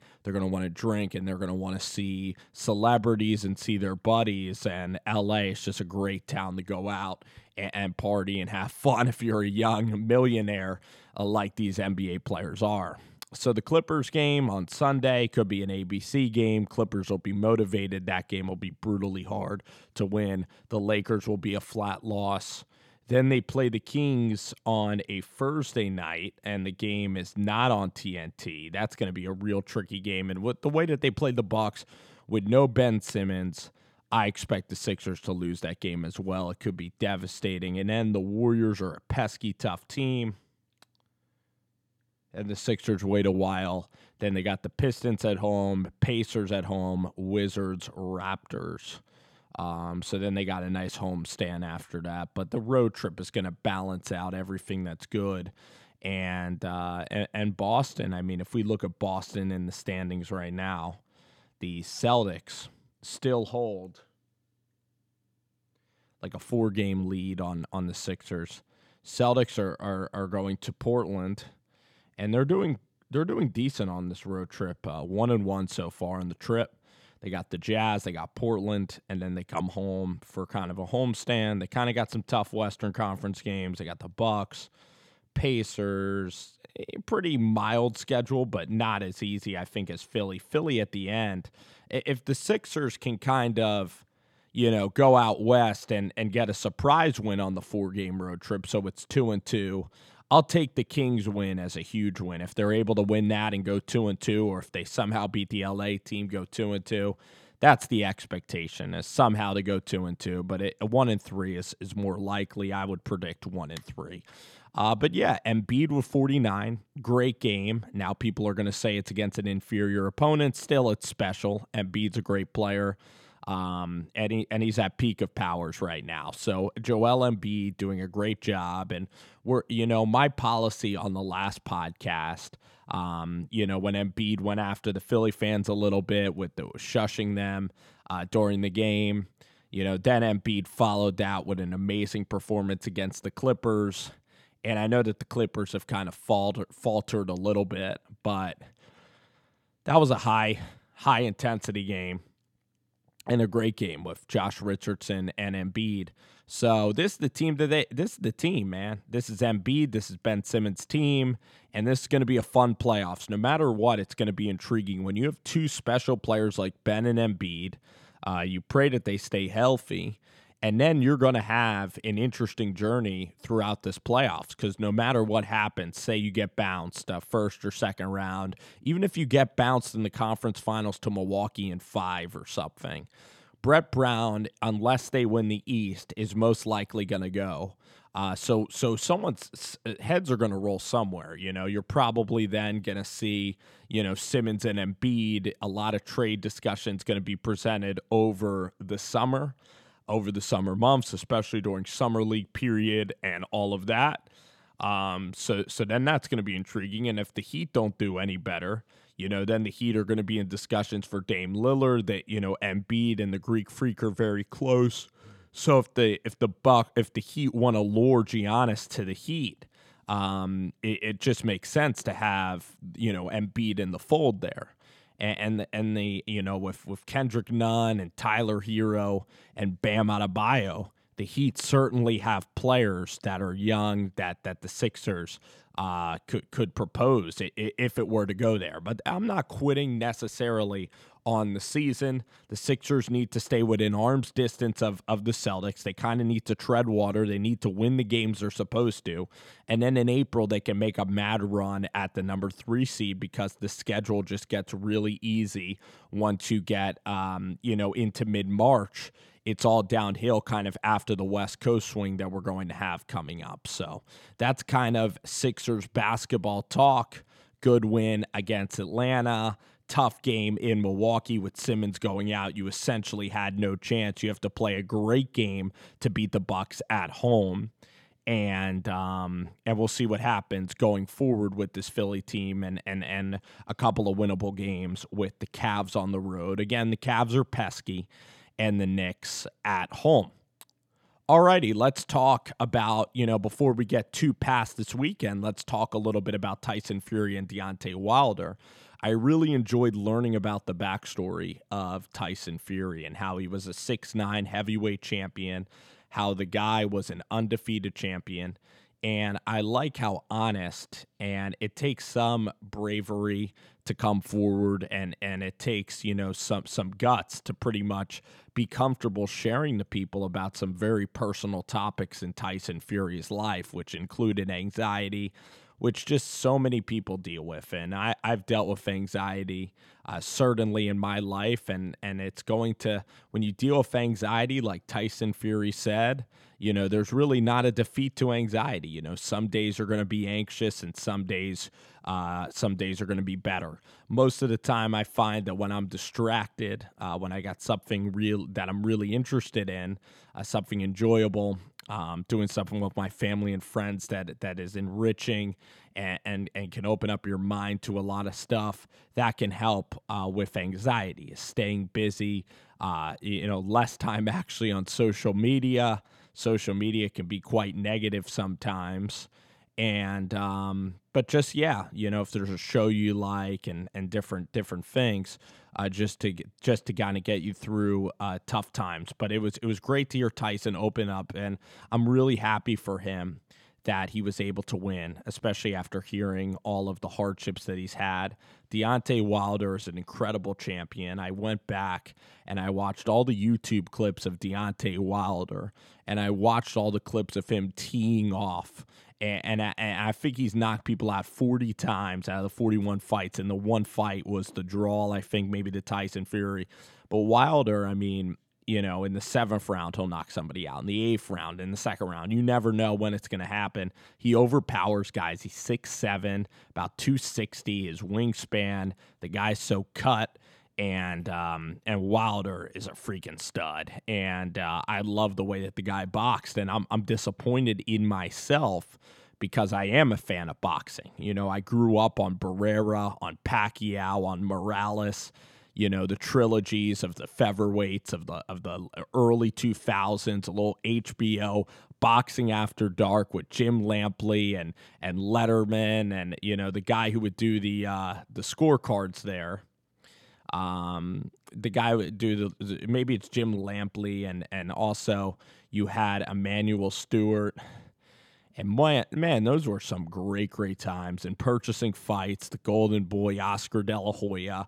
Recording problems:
none

